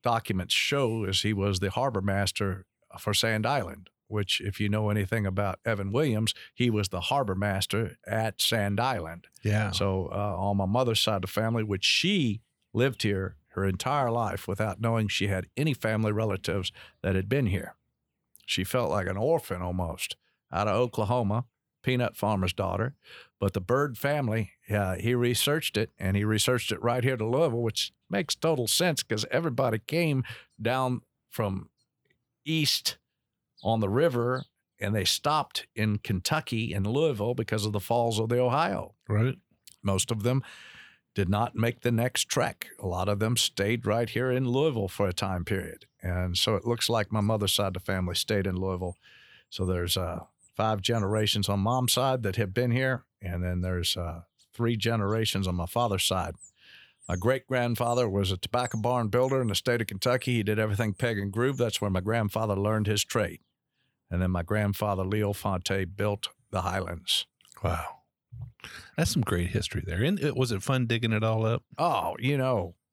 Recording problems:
none

